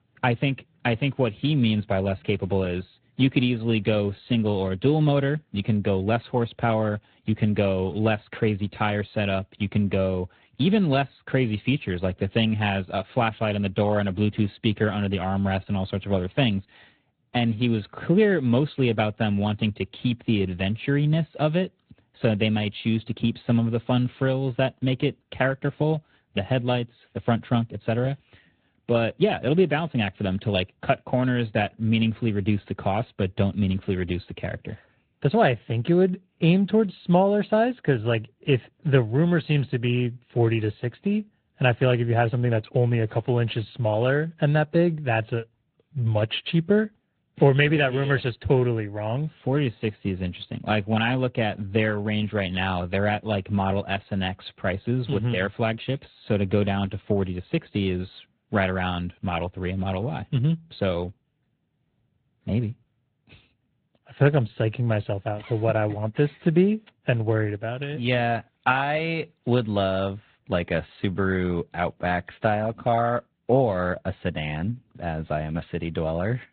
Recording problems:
high frequencies cut off; severe; nothing above 4 kHz
garbled, watery; slightly

